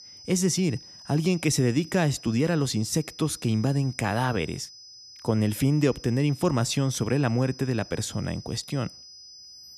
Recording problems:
high-pitched whine; noticeable; throughout; 5 kHz, 20 dB below the speech

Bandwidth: 14 kHz